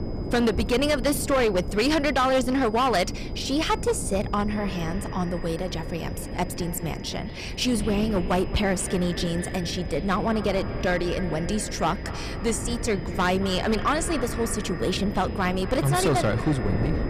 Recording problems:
echo of what is said; noticeable; from 4.5 s on; 220 ms later, 15 dB below the speech
distortion; slight; 7% of the sound clipped
wind noise on the microphone; occasional gusts; 15 dB below the speech
high-pitched whine; faint; throughout; 5 kHz, 25 dB below the speech

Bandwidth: 15 kHz